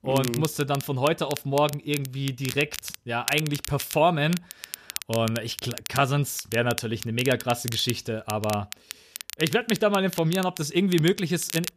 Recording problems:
crackle, like an old record; noticeable; 10 dB below the speech

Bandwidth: 14.5 kHz